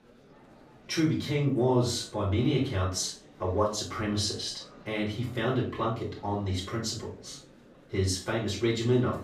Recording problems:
off-mic speech; far
room echo; slight; dies away in 0.3 s
murmuring crowd; faint; throughout; 25 dB below the speech

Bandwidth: 15 kHz